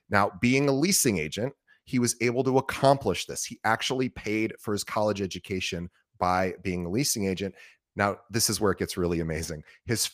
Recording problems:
none

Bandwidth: 15 kHz